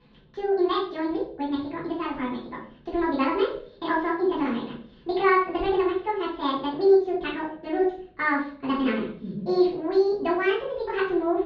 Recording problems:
off-mic speech; far
wrong speed and pitch; too fast and too high; 1.7 times normal speed
room echo; noticeable; dies away in 0.4 s
muffled; slightly; fading above 4 kHz

